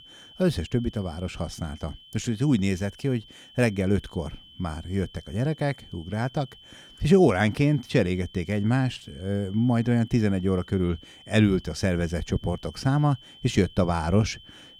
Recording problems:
high-pitched whine; faint; throughout; 3 kHz, 20 dB below the speech

